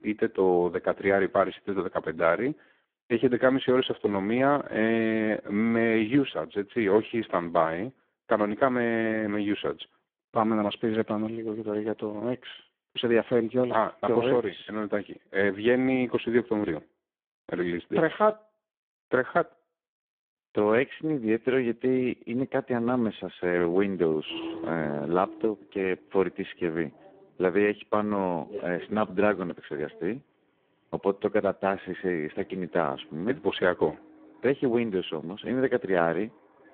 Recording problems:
phone-call audio; poor line
traffic noise; noticeable; from 24 s on; 15 dB below the speech

